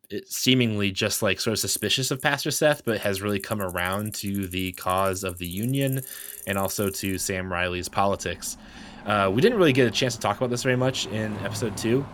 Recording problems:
traffic noise; noticeable; throughout; 15 dB below the speech

